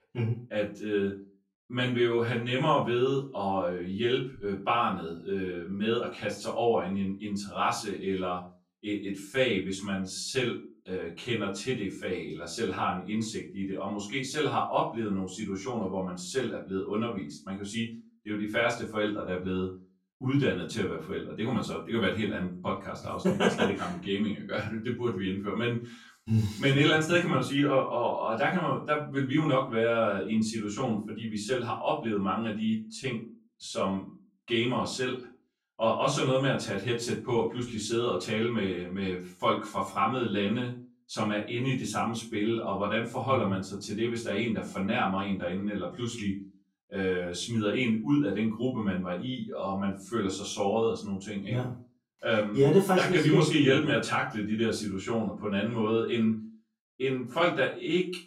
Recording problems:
off-mic speech; far
room echo; slight; dies away in 0.3 s

